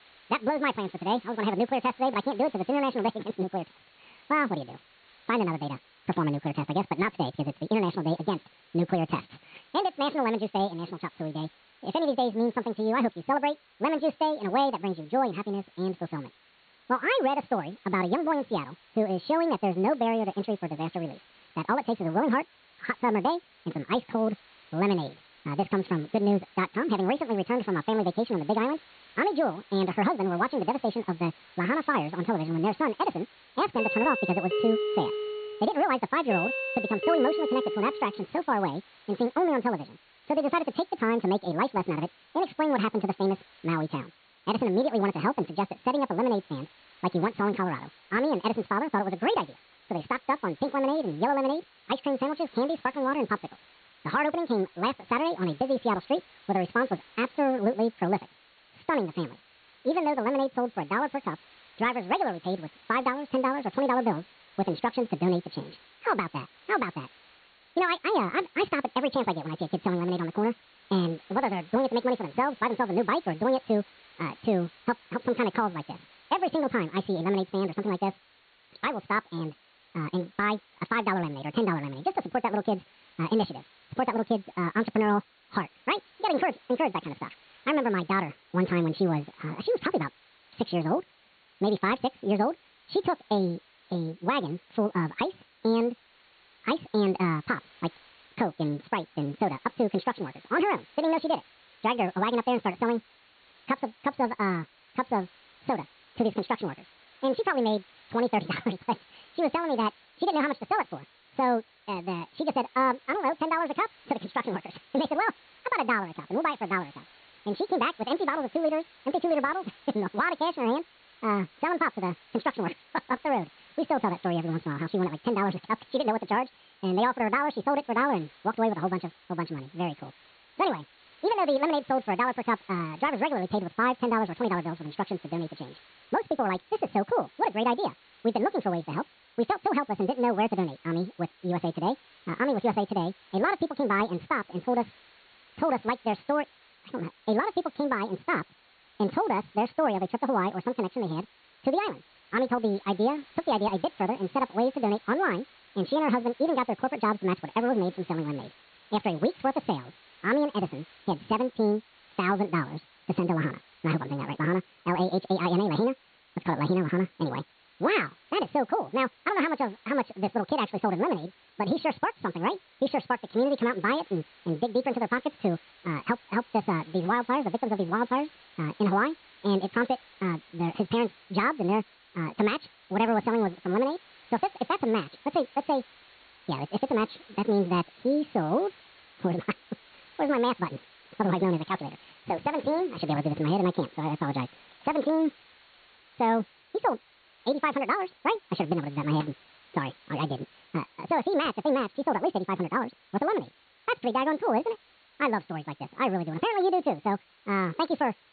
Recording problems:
high frequencies cut off; severe; nothing above 4.5 kHz
wrong speed and pitch; too fast and too high; 1.7 times normal speed
hiss; faint; throughout; 25 dB below the speech
doorbell; loud; from 34 to 38 s; peak 1 dB above the speech

